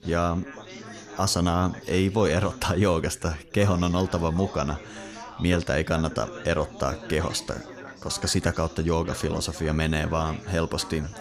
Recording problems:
background chatter; noticeable; throughout; 4 voices, 15 dB below the speech

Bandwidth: 14.5 kHz